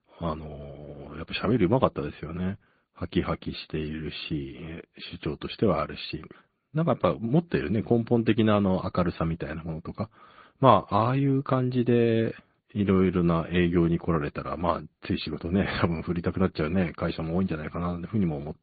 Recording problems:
high frequencies cut off; severe; nothing above 4.5 kHz
garbled, watery; slightly

